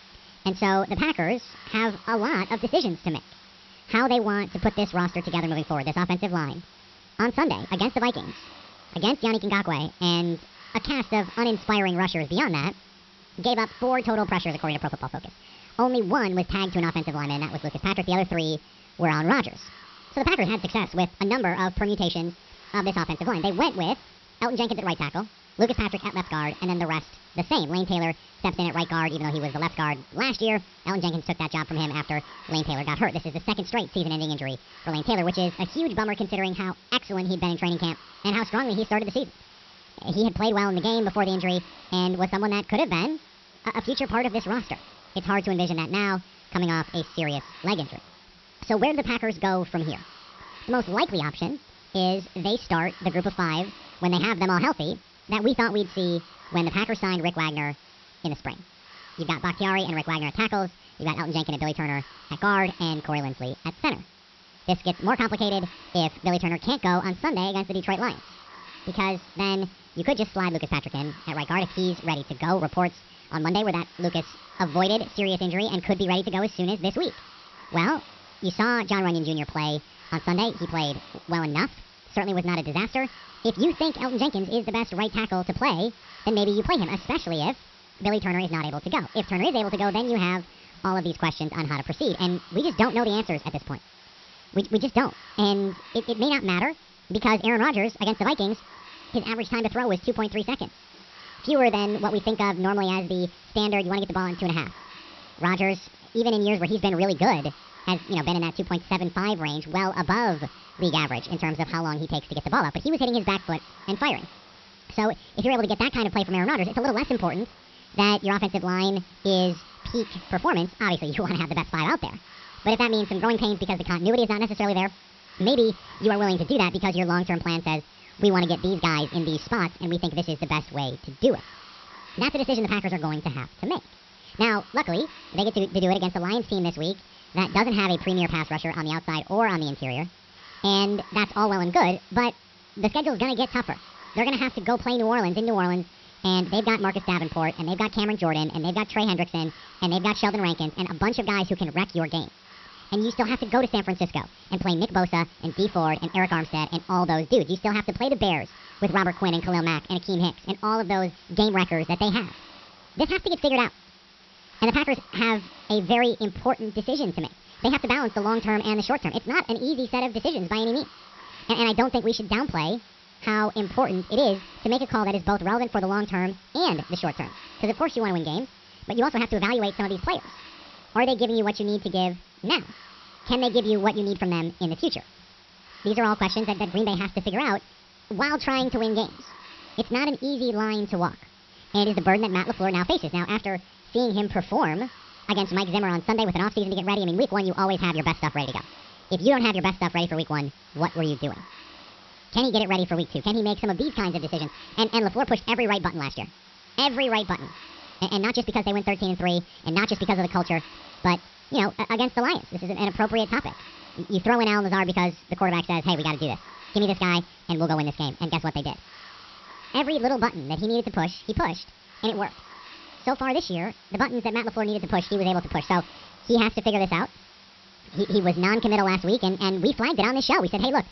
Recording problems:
wrong speed and pitch; too fast and too high; 1.6 times normal speed
high frequencies cut off; noticeable; nothing above 5.5 kHz
hiss; faint; throughout; 20 dB below the speech

